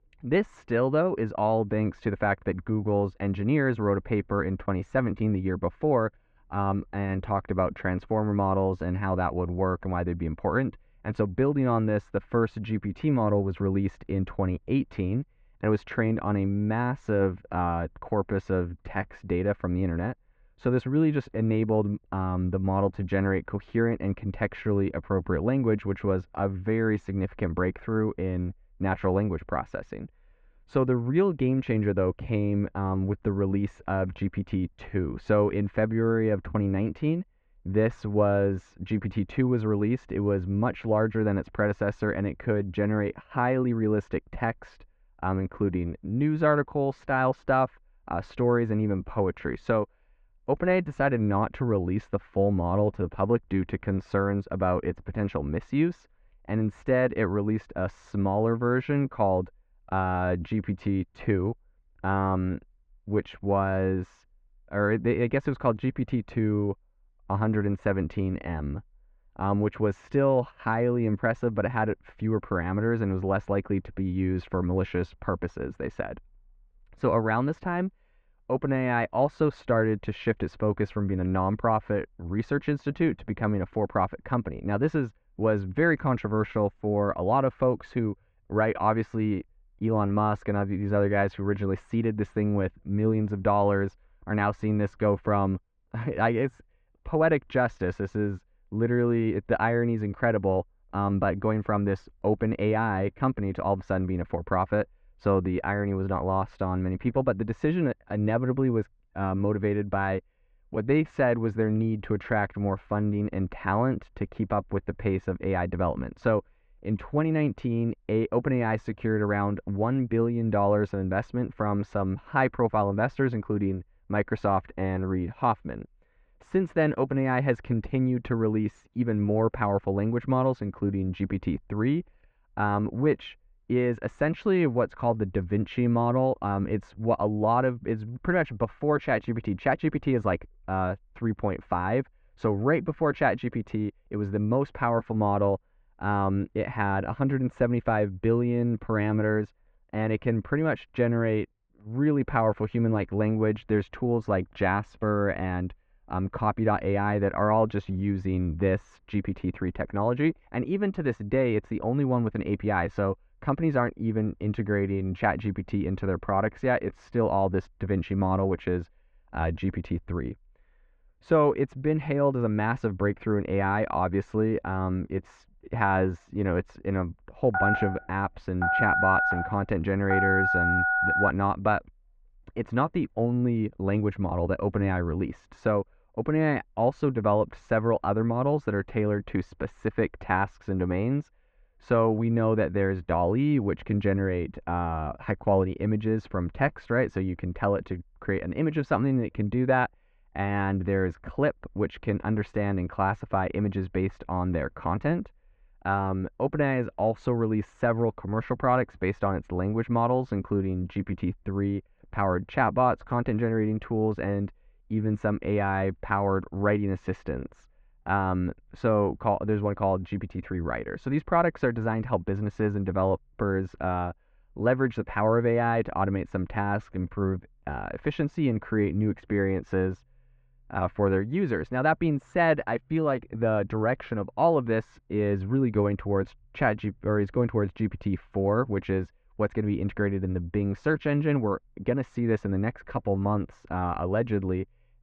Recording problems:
muffled; very; fading above 2 kHz
phone ringing; loud; from 2:58 to 3:01; peak 4 dB above the speech

